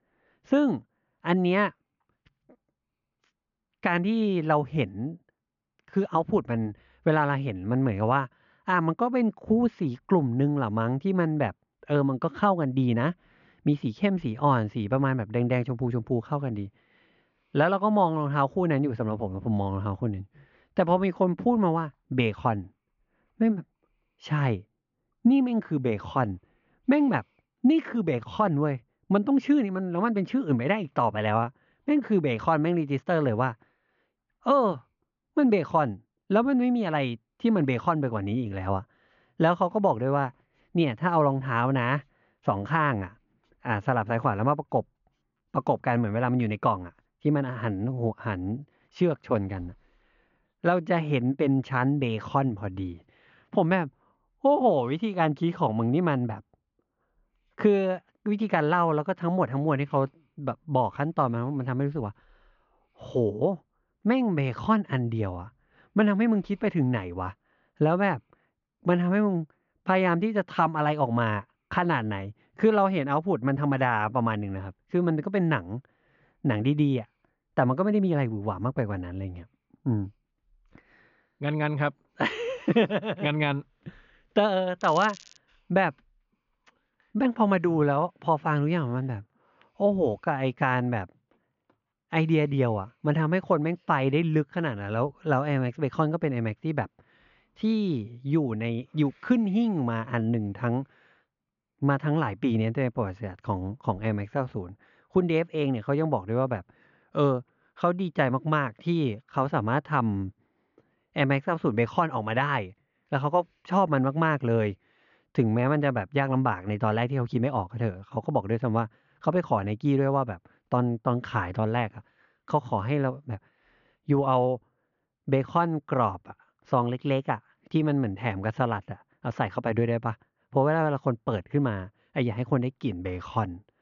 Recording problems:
high frequencies cut off; noticeable; nothing above 7 kHz
muffled; very slightly; fading above 2.5 kHz
crackling; noticeable; at 1:25; 20 dB below the speech

